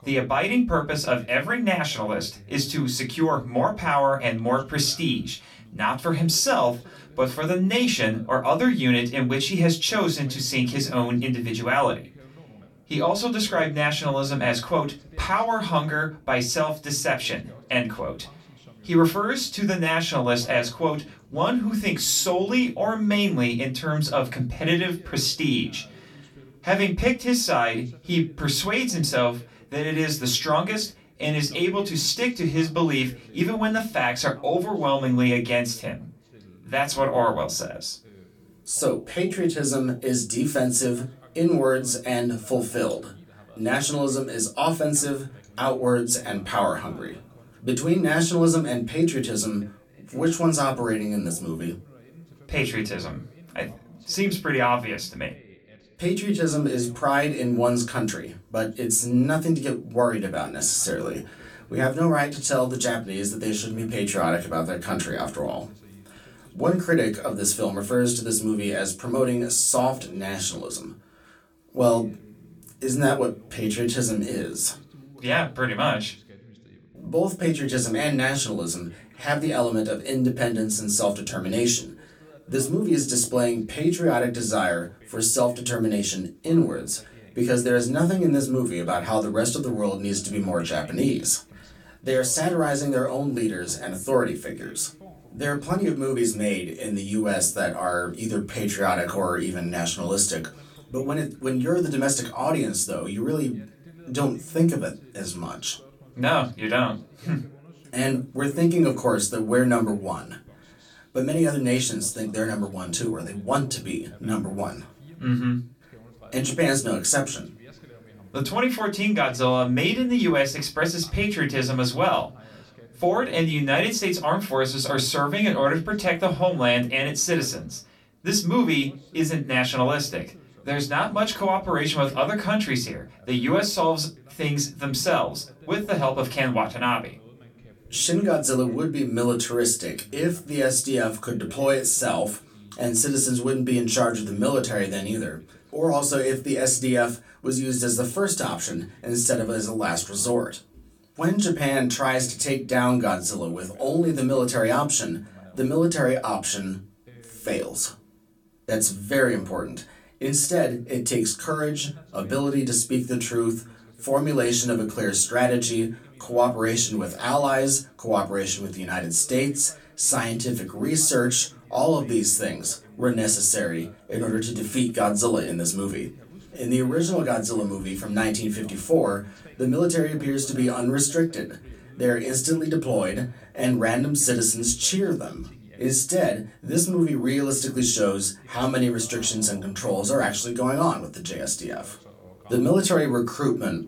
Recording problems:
off-mic speech; far
room echo; very slight; dies away in 0.2 s
voice in the background; faint; throughout; 25 dB below the speech

